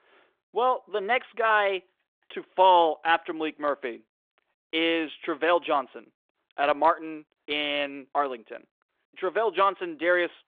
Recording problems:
phone-call audio; nothing above 3.5 kHz

